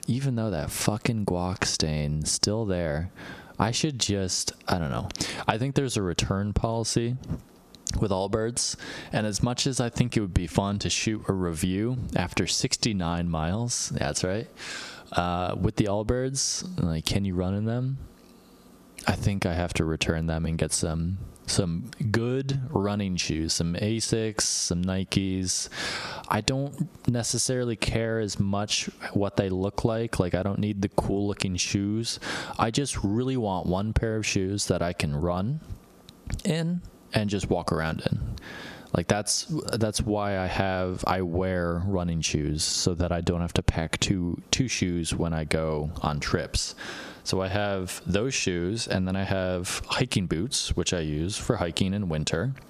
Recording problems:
squashed, flat; heavily

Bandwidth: 14.5 kHz